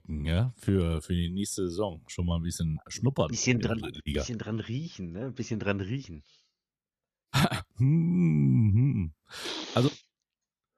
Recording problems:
none

